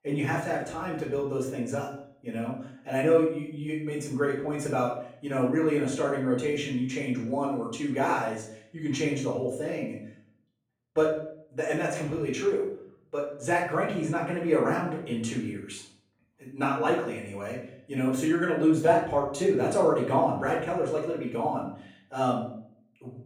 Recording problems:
off-mic speech; far
room echo; noticeable; dies away in 0.6 s

